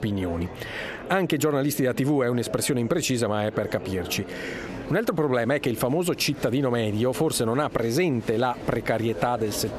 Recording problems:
squashed, flat; heavily, background pumping
murmuring crowd; noticeable; throughout; 15 dB below the speech

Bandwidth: 14 kHz